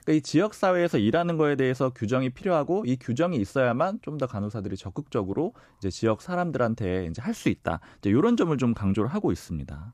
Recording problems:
none

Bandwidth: 14.5 kHz